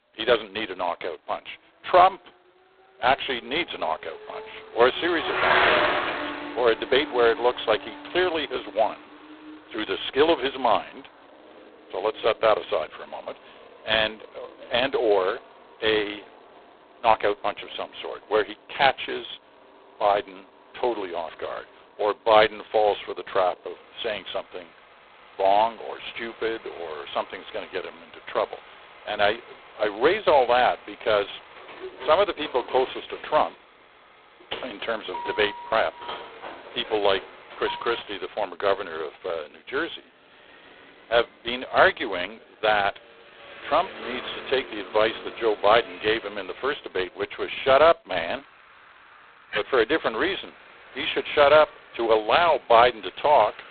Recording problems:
phone-call audio; poor line; nothing above 4 kHz
traffic noise; loud; throughout; 9 dB below the speech
door banging; noticeable; from 32 to 38 s; peak 10 dB below the speech

